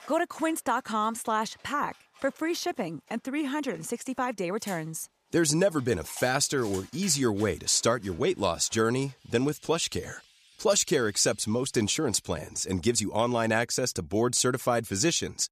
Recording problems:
animal sounds; faint; until 12 s; 25 dB below the speech

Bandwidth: 14.5 kHz